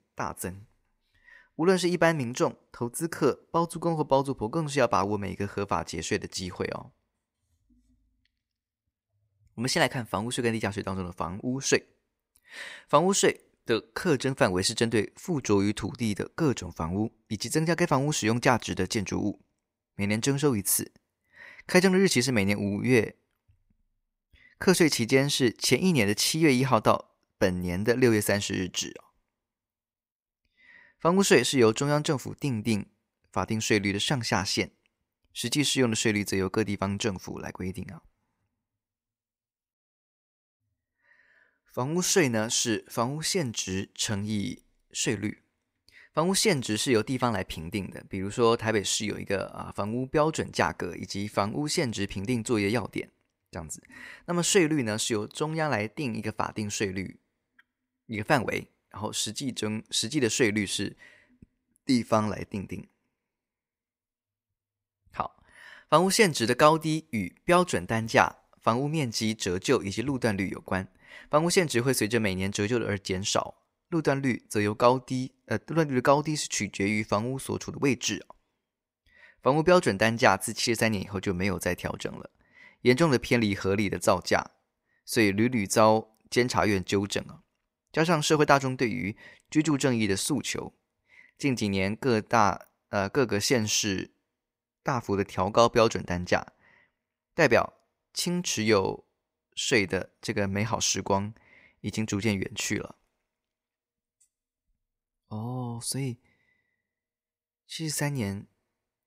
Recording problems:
none

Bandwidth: 15.5 kHz